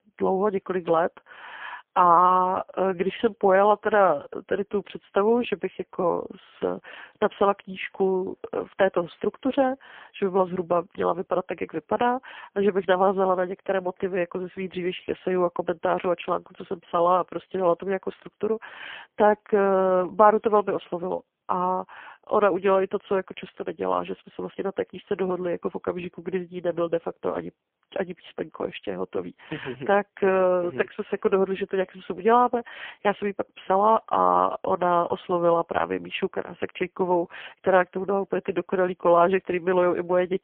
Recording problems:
phone-call audio; poor line; nothing above 3 kHz

